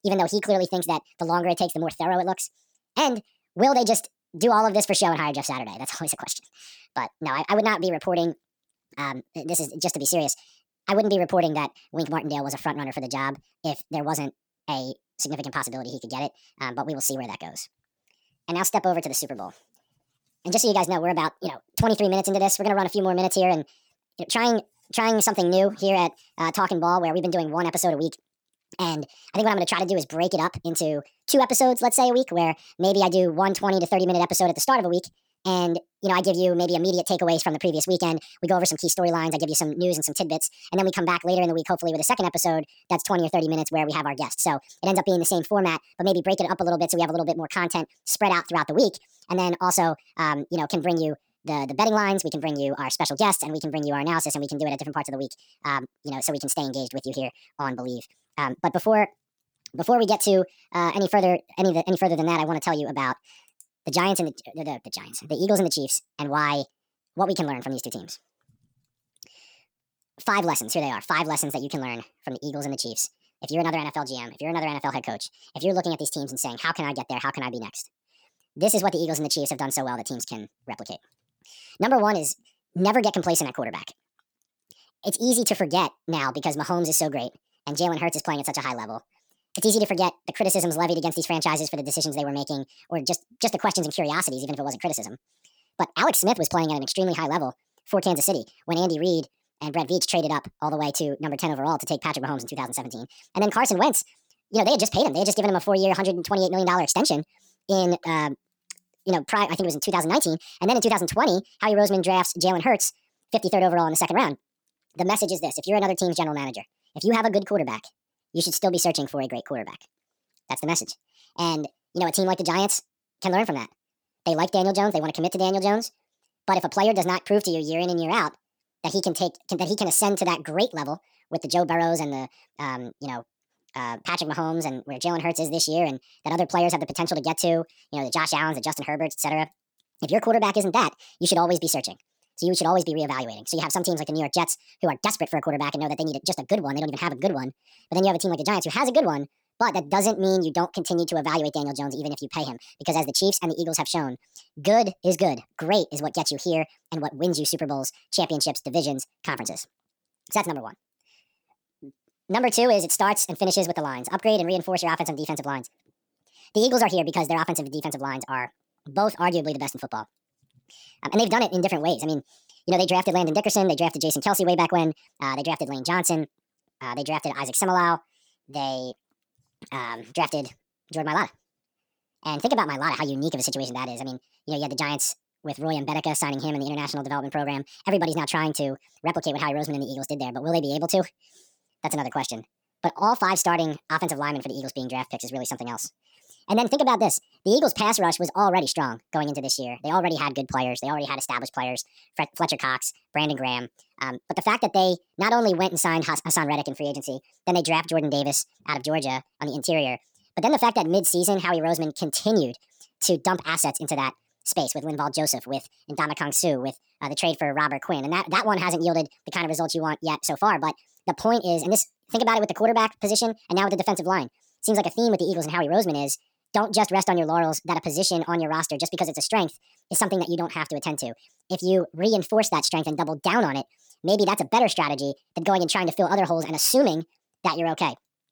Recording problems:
wrong speed and pitch; too fast and too high; 1.5 times normal speed

